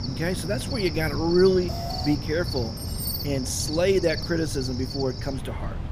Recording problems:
animal sounds; loud; throughout; 6 dB below the speech
alarm; faint; at 1.5 s; peak 10 dB below the speech
jangling keys; noticeable; at 3 s; peak 5 dB below the speech

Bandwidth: 14.5 kHz